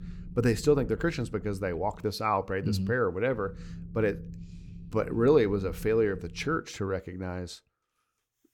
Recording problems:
low rumble; faint; until 2 s and from 3.5 to 6.5 s; 25 dB below the speech

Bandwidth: 17.5 kHz